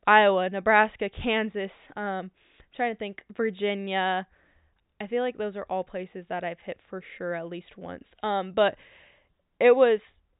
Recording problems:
high frequencies cut off; severe; nothing above 4 kHz

